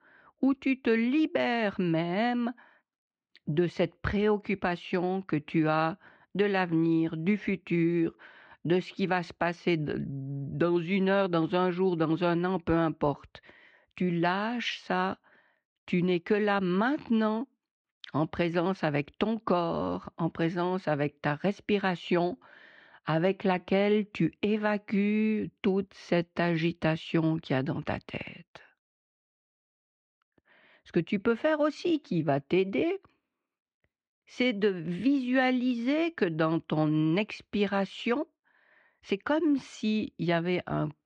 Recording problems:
muffled; slightly; fading above 3 kHz

